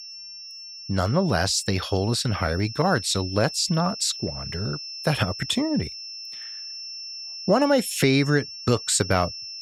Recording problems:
high-pitched whine; noticeable; throughout; 5.5 kHz, 10 dB below the speech

